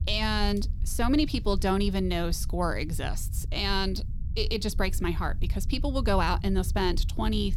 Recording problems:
low rumble; faint; throughout; 20 dB below the speech

